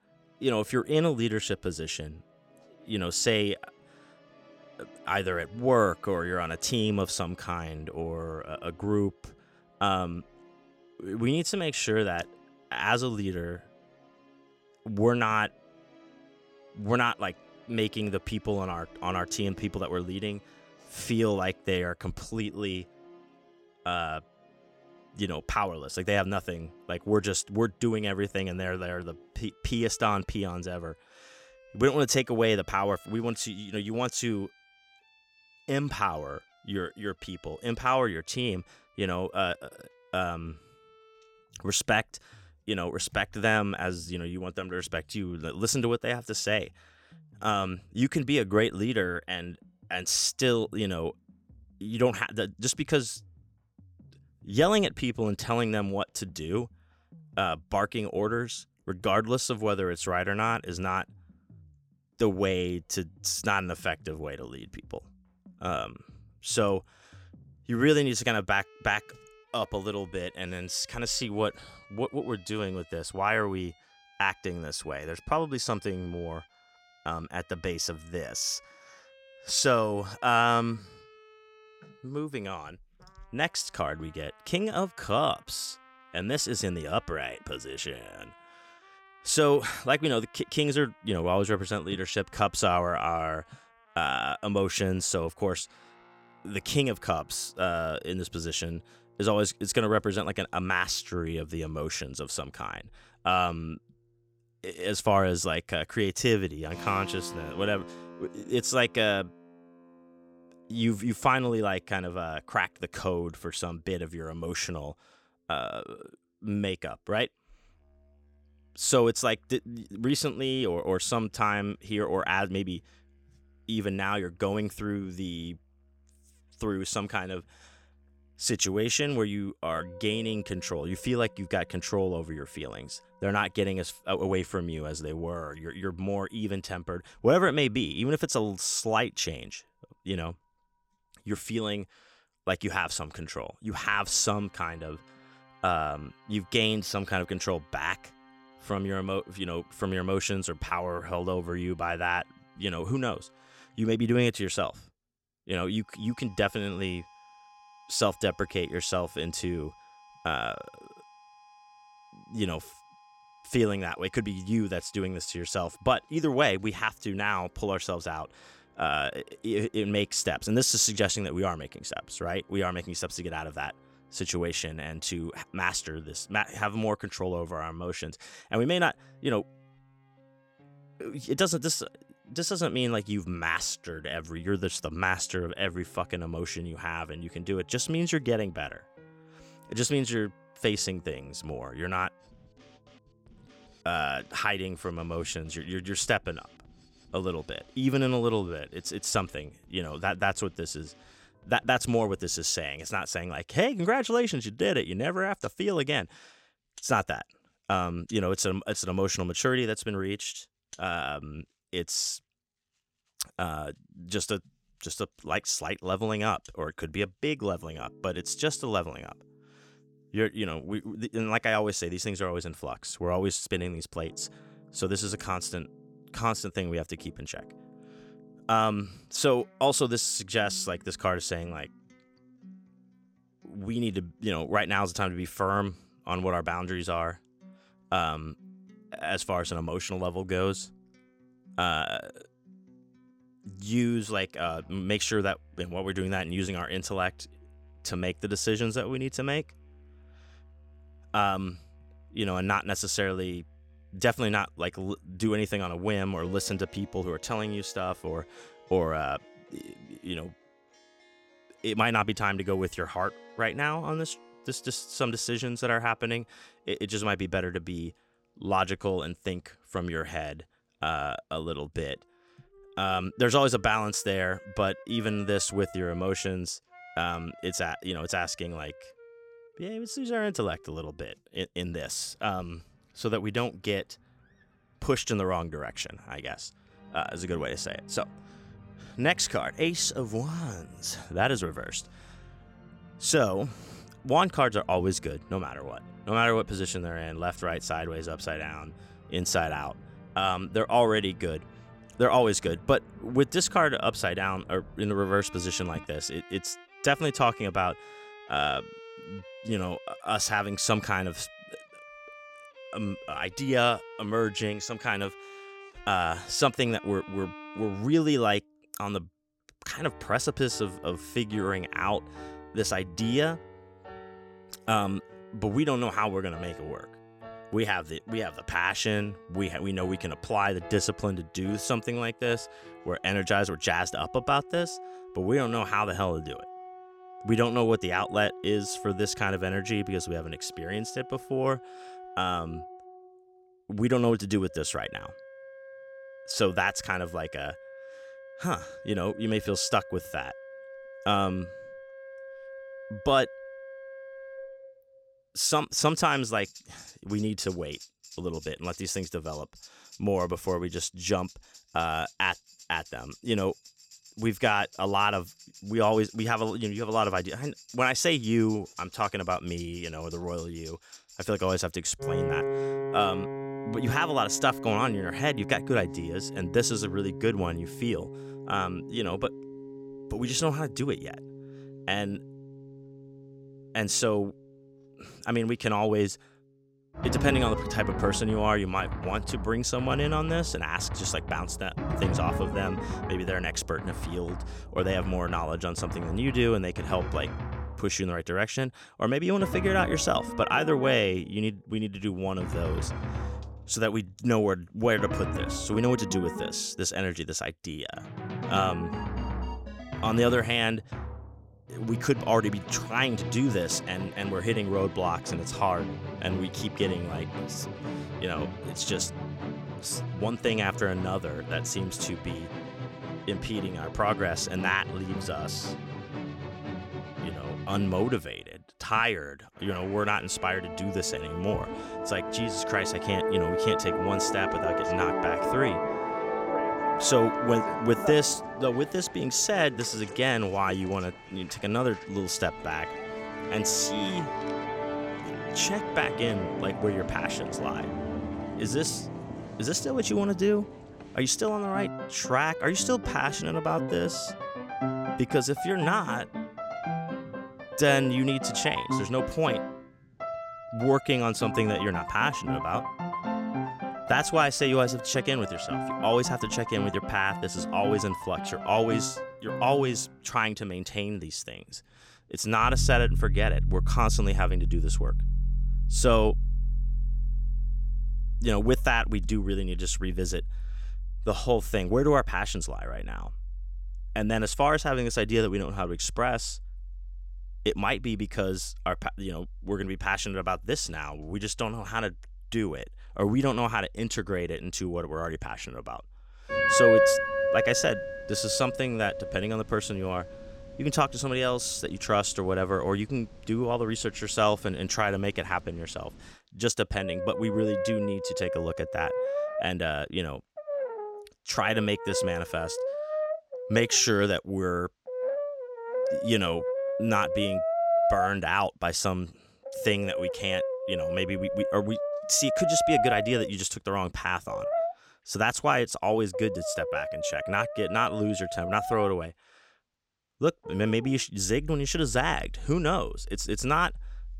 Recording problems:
background music; loud; throughout; 6 dB below the speech

